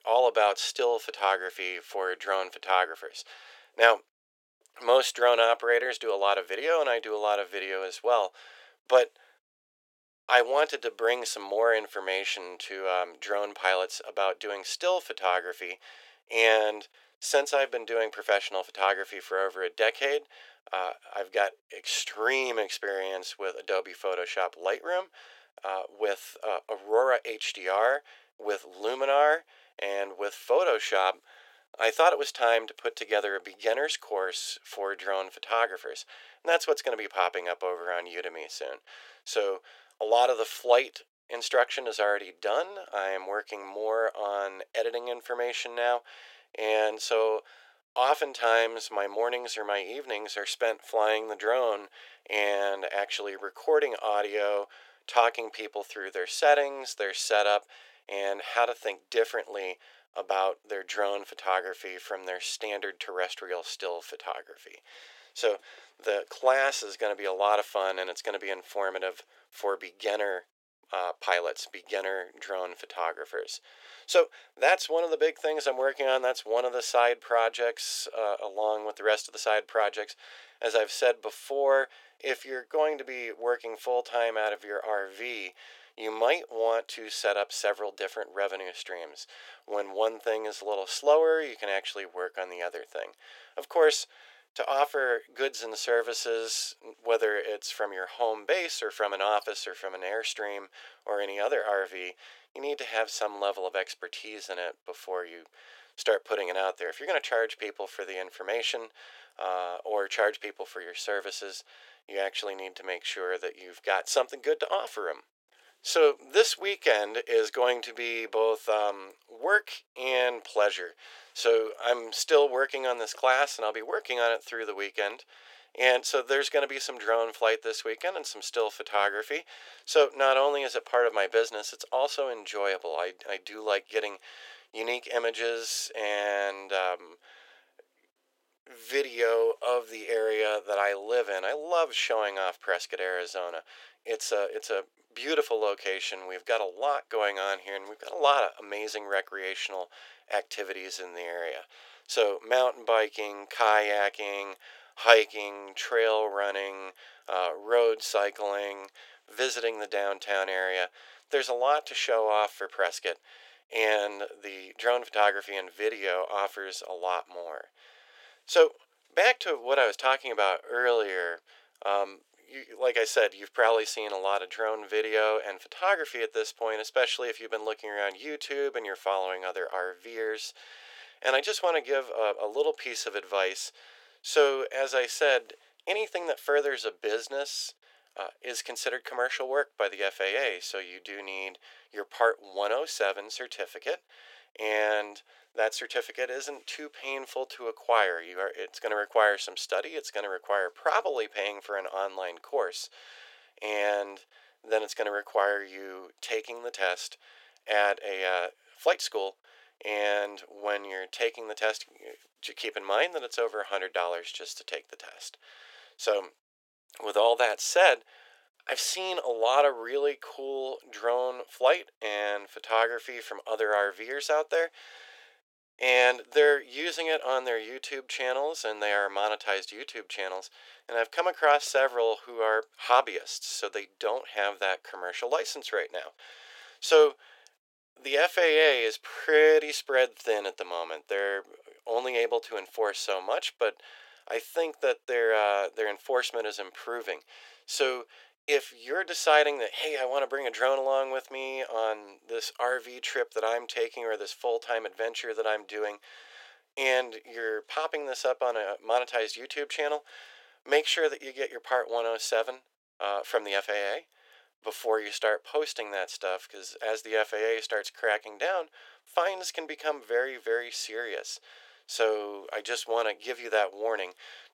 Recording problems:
thin; very; fading below 400 Hz

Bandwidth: 16.5 kHz